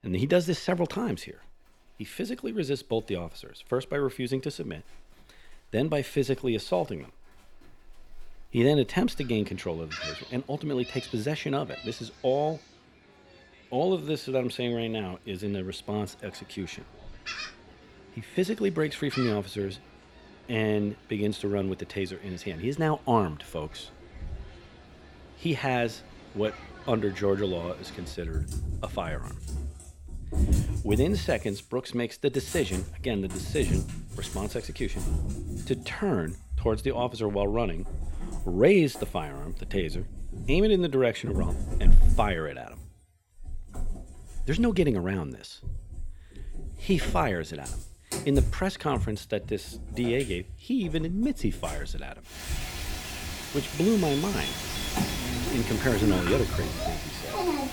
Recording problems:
animal sounds; loud; throughout; 5 dB below the speech

